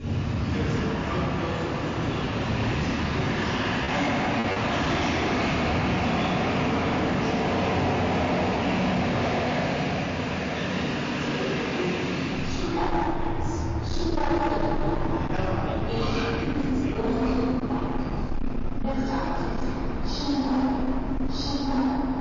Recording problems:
room echo; strong; dies away in 3 s
off-mic speech; far
distortion; slight; 15% of the sound clipped
garbled, watery; slightly; nothing above 6.5 kHz
train or aircraft noise; very loud; throughout; 8 dB above the speech
choppy; occasionally; at 4 s; 2% of the speech affected

